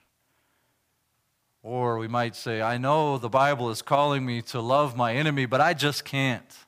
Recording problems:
none

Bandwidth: 15 kHz